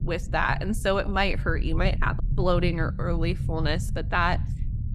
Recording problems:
low rumble; noticeable; throughout; 15 dB below the speech

